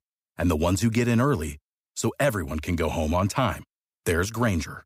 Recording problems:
none

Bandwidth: 15.5 kHz